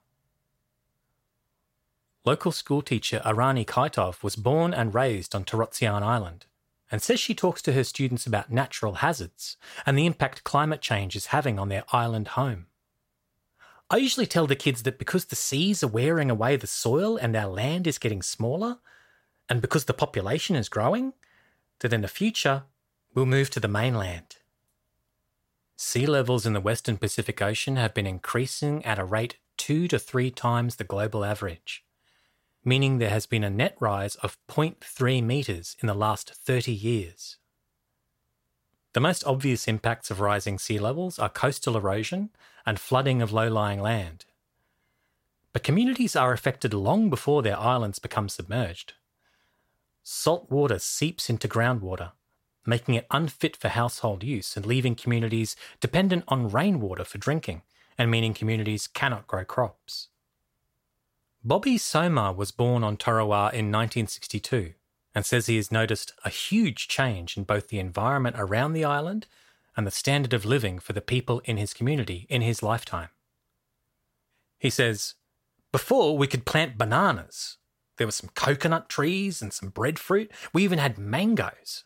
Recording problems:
none

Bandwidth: 16 kHz